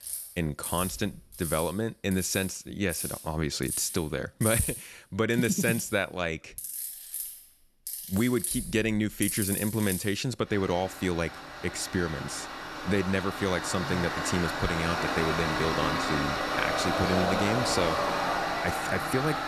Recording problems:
machinery noise; loud; throughout; 2 dB below the speech

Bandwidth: 13.5 kHz